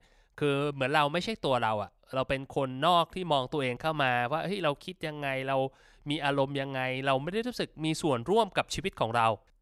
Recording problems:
none

